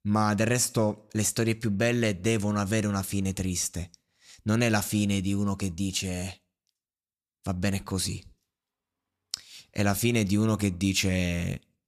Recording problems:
none

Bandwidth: 14.5 kHz